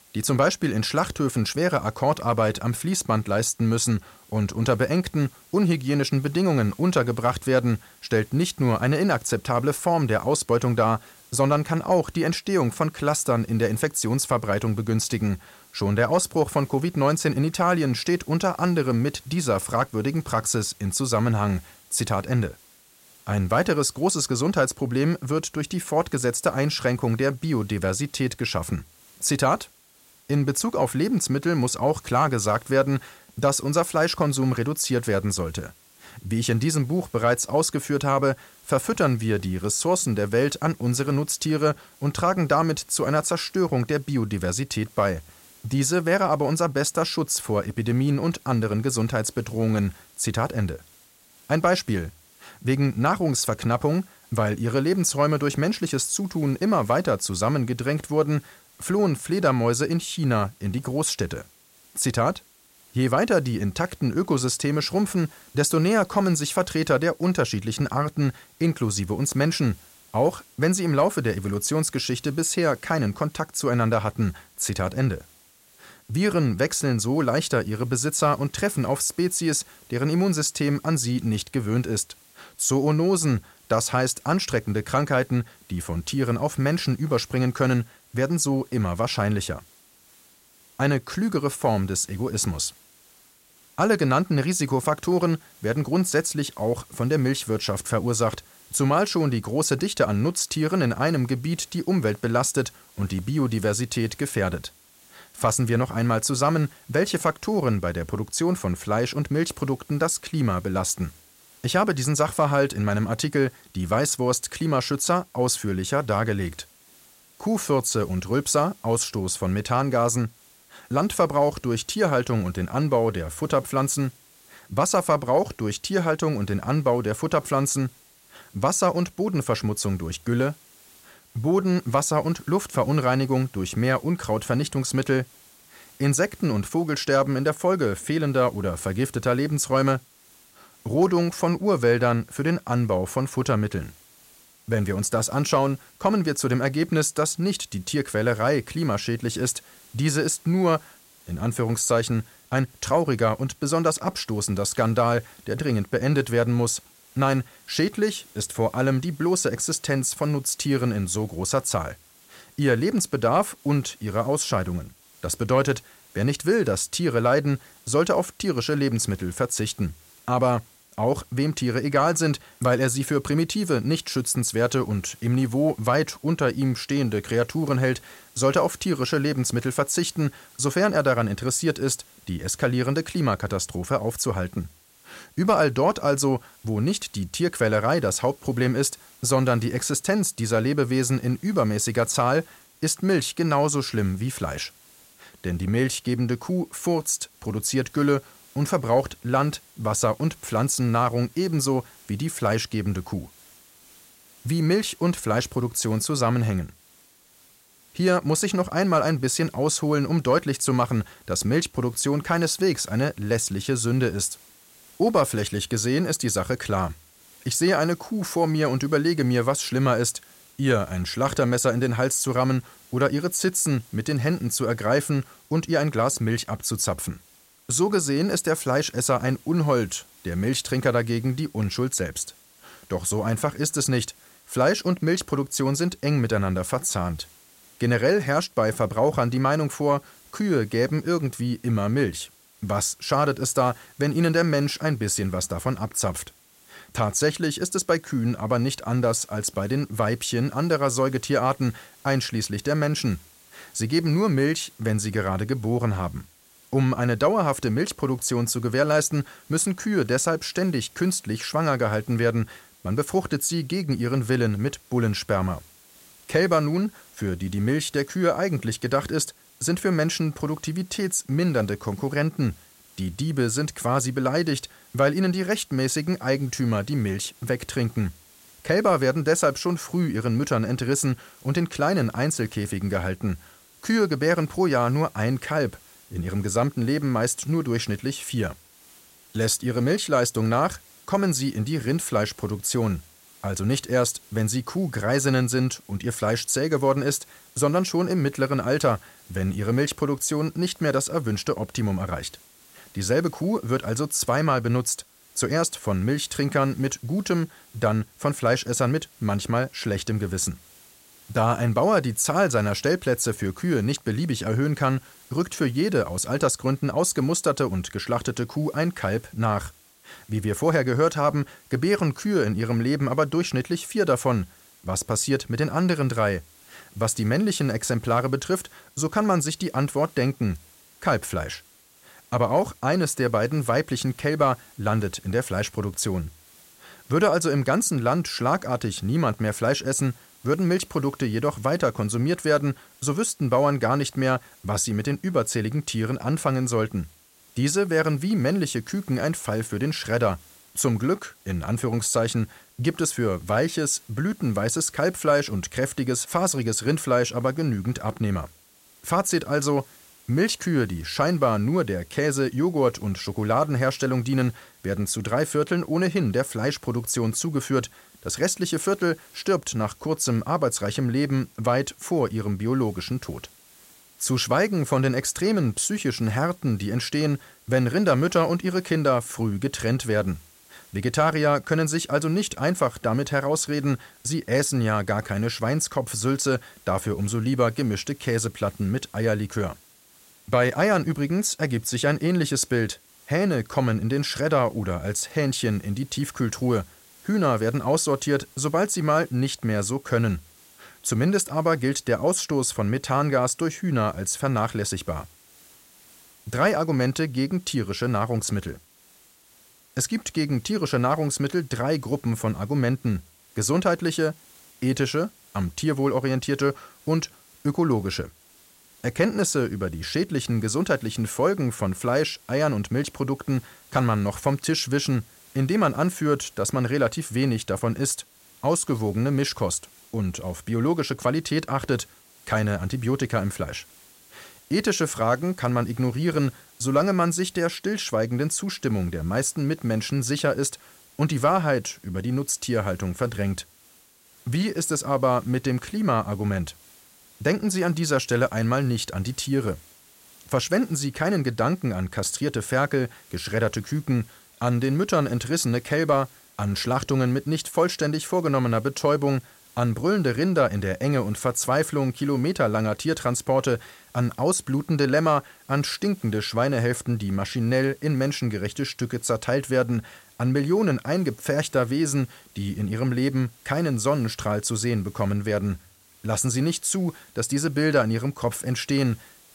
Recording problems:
hiss; faint; throughout; 25 dB below the speech

